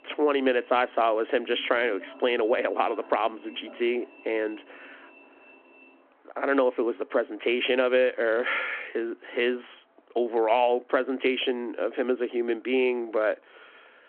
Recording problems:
phone-call audio
traffic noise; faint; throughout; 25 dB below the speech

